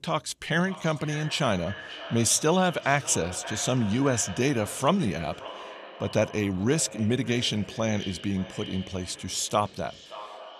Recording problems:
echo of what is said; noticeable; throughout; 570 ms later, 15 dB below the speech

